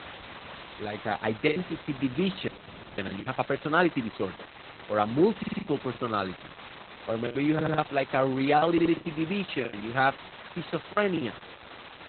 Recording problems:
garbled, watery; badly; nothing above 4 kHz
hiss; noticeable; throughout; 15 dB below the speech
choppy; very; 9% of the speech affected
audio freezing; at 2.5 s for 0.5 s
audio stuttering; at 5.5 s, at 7.5 s and at 8.5 s

